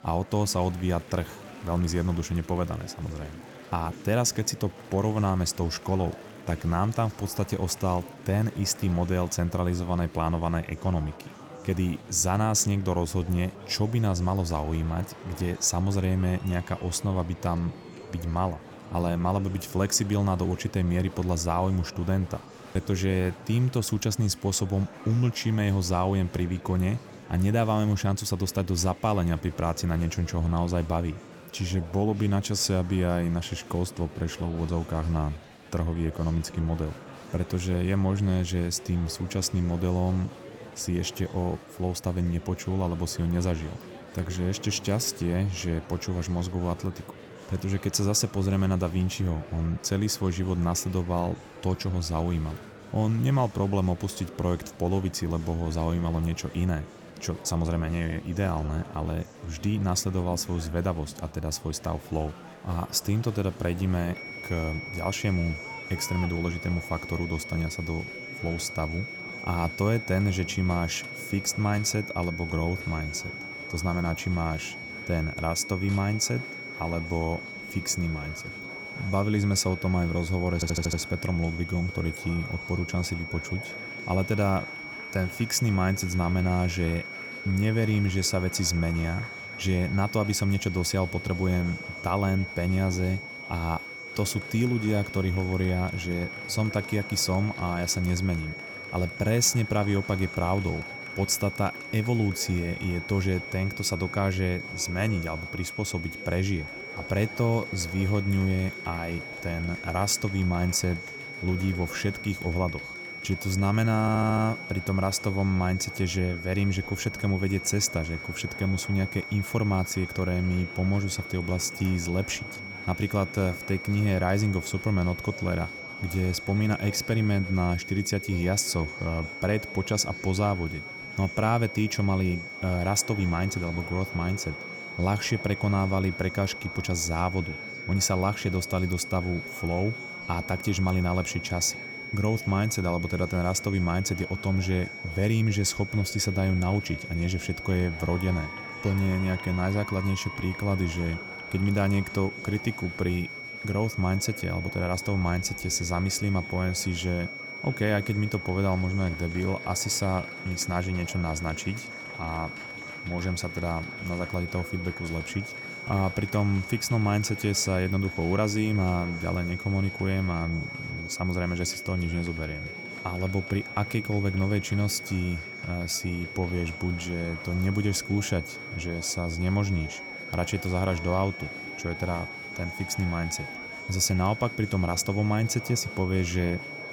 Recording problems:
high-pitched whine; loud; from 1:04 on; 2 kHz, 9 dB below the speech
murmuring crowd; noticeable; throughout; 15 dB below the speech
audio stuttering; at 1:21 and at 1:54

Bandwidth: 17.5 kHz